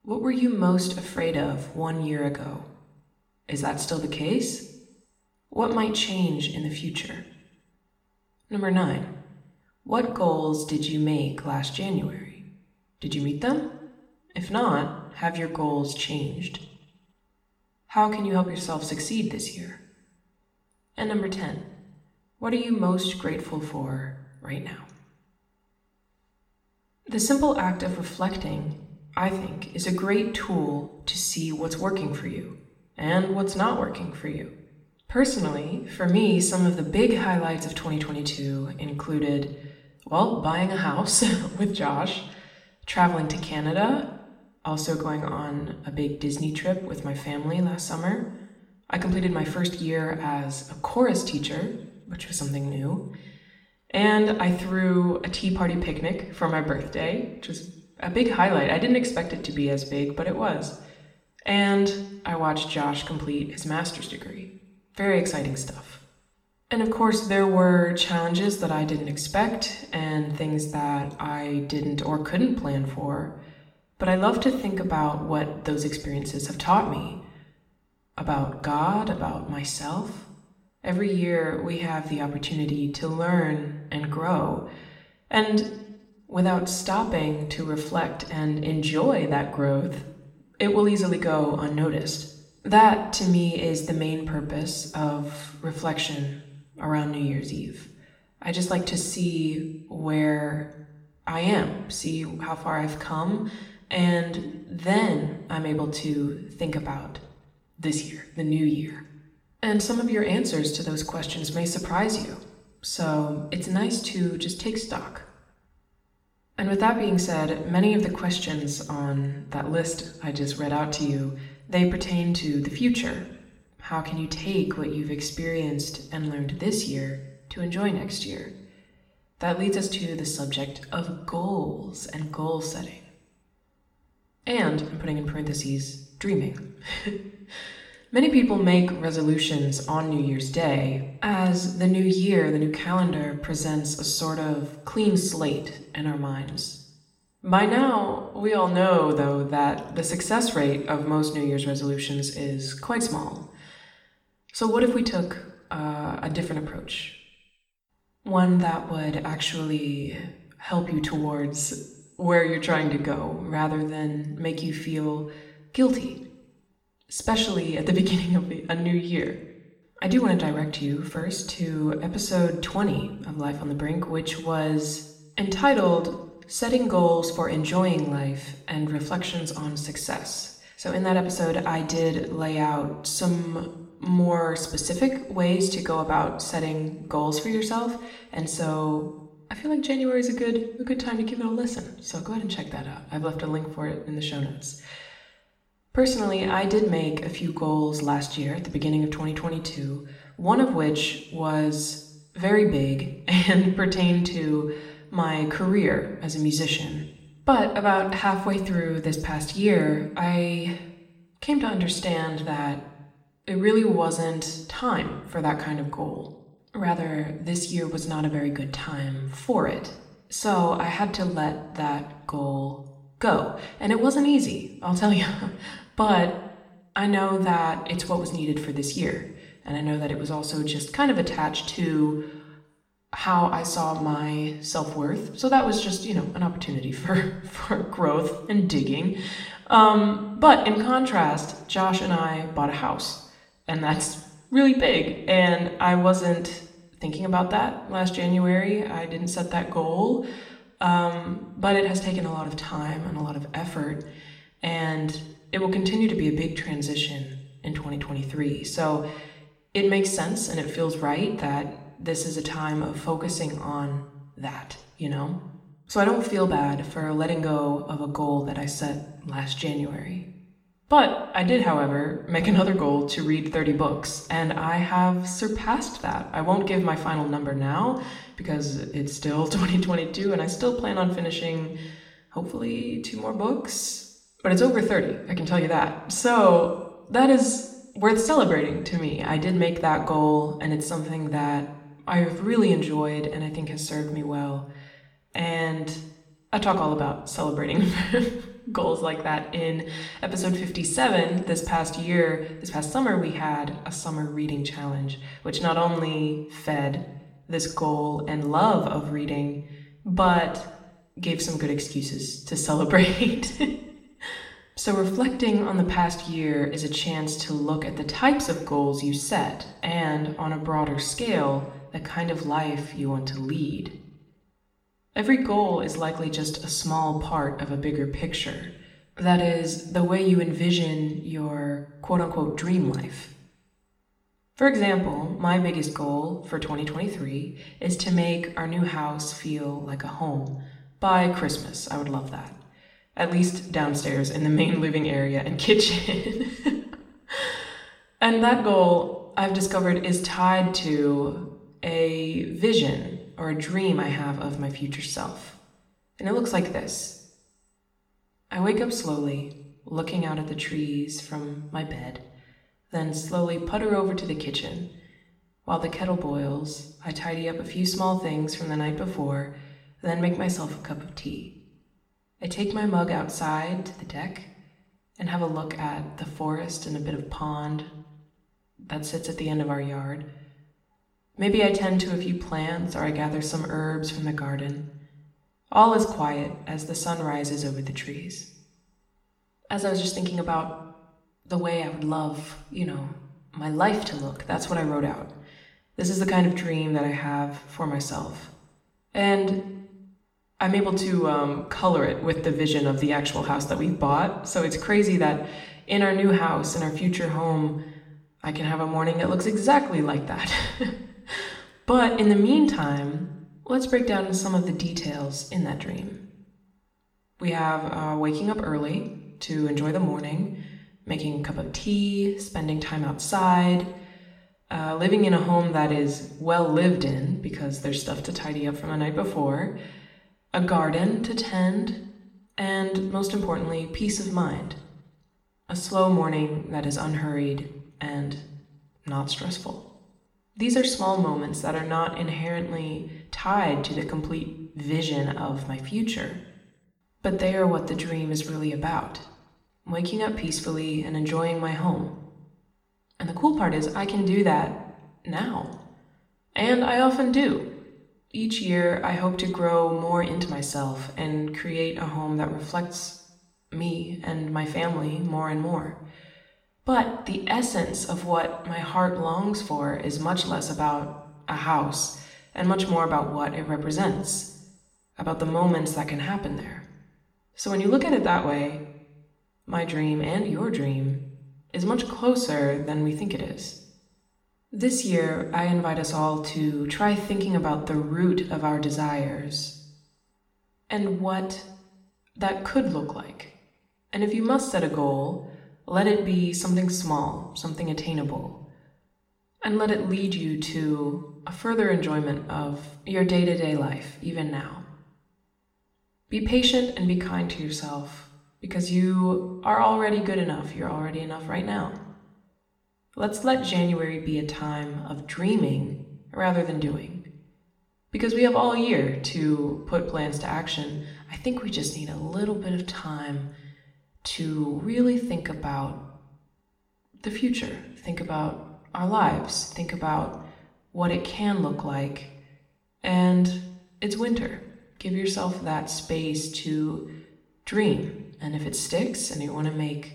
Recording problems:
room echo; slight; dies away in 0.7 s
off-mic speech; somewhat distant

